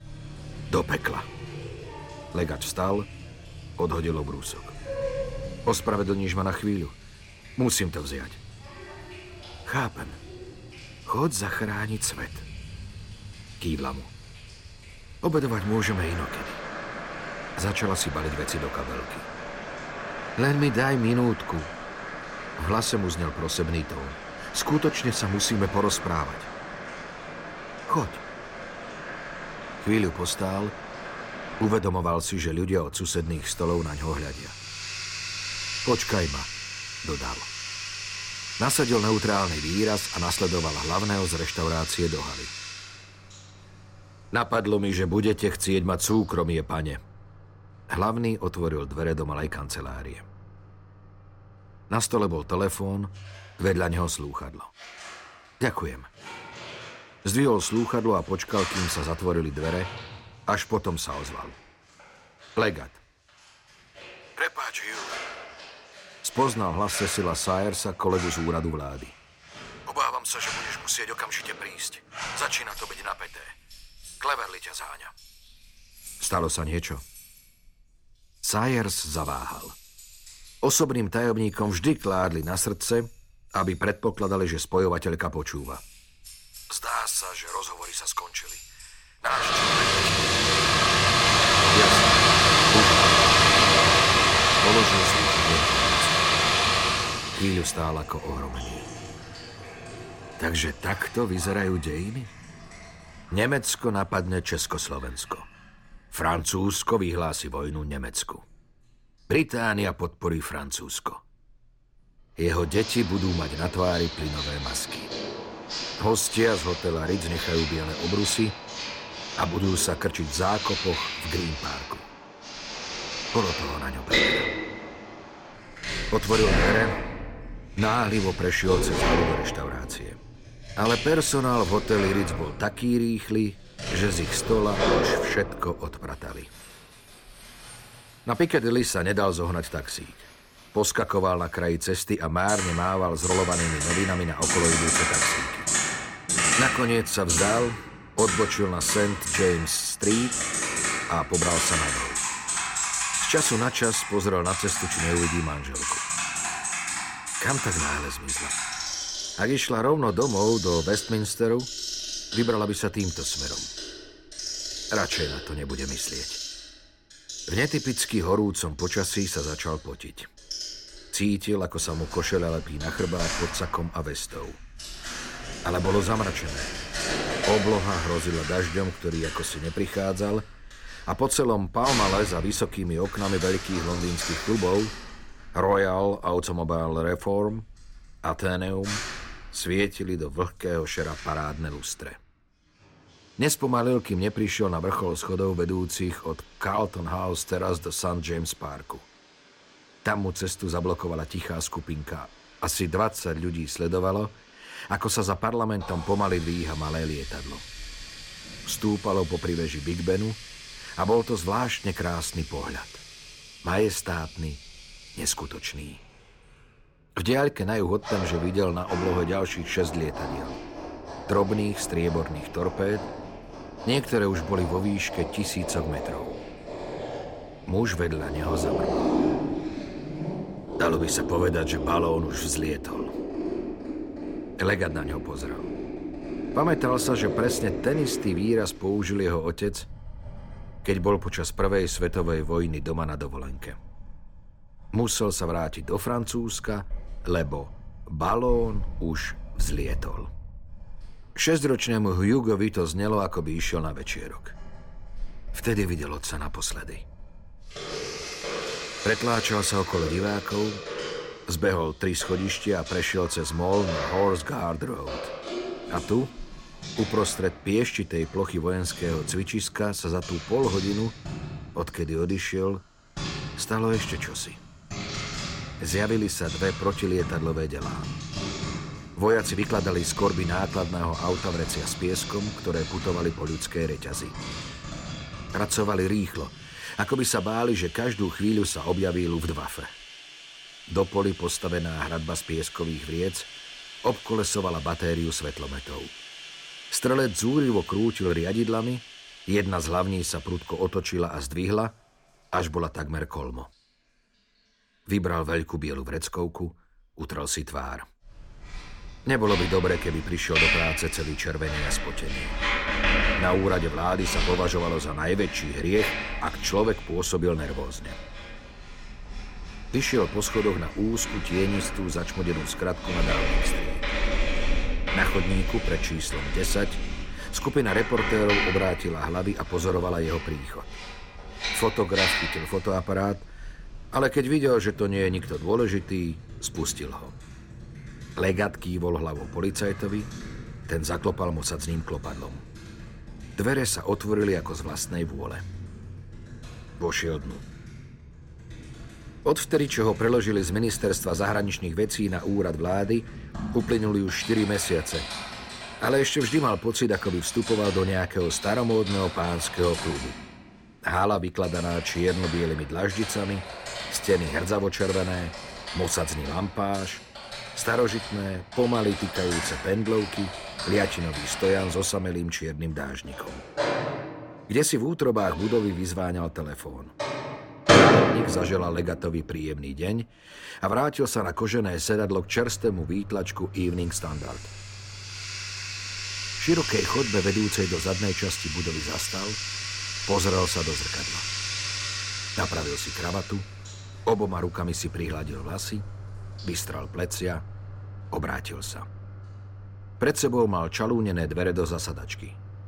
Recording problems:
household noises; loud; throughout; 2 dB below the speech

